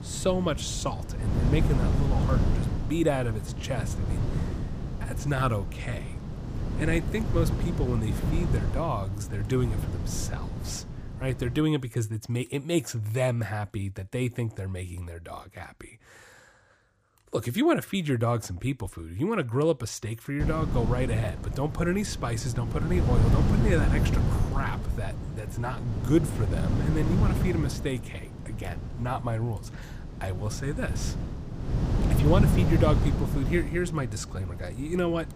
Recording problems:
wind noise on the microphone; heavy; until 12 s and from 20 s on; 6 dB below the speech

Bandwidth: 15 kHz